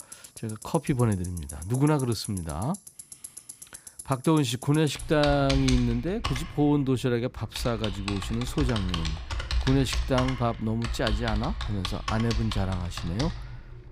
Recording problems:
household noises; loud; throughout; 7 dB below the speech

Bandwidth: 15.5 kHz